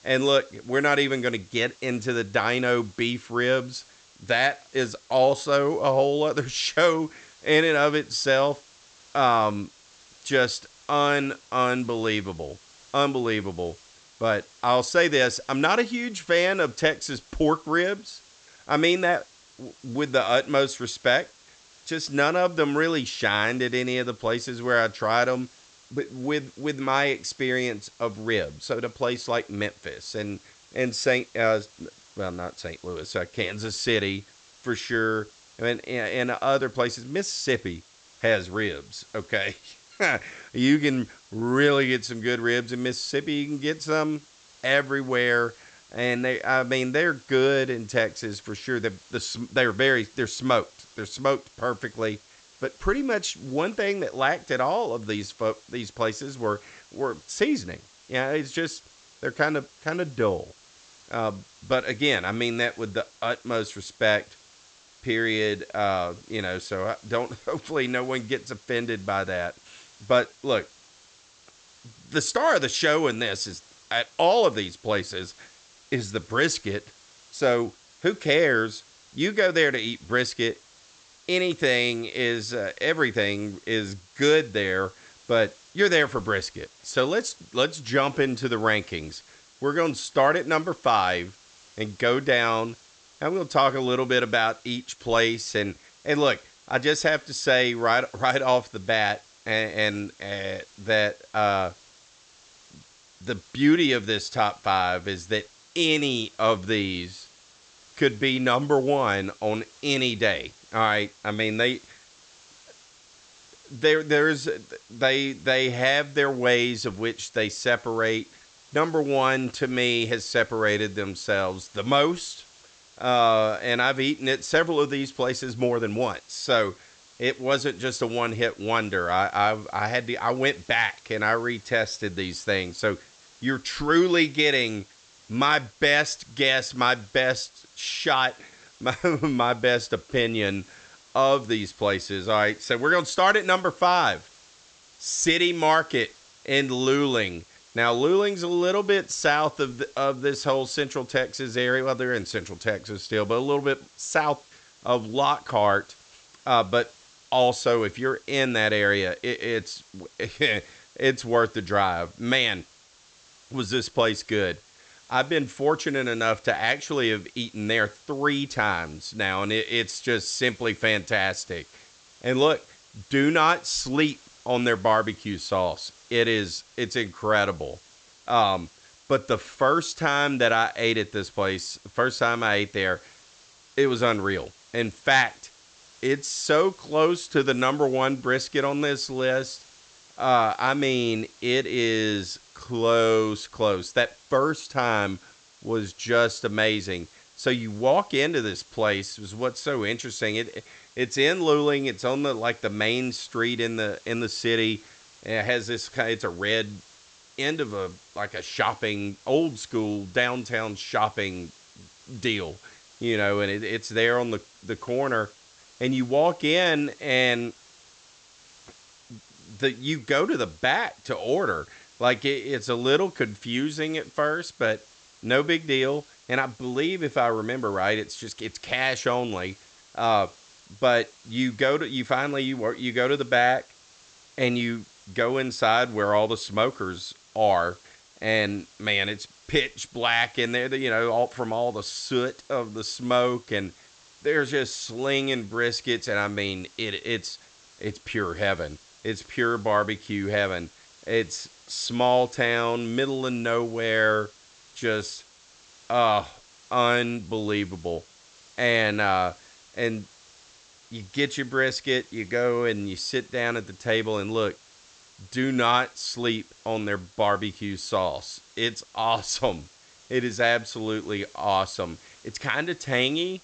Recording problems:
high frequencies cut off; noticeable; nothing above 8 kHz
hiss; faint; throughout; 25 dB below the speech

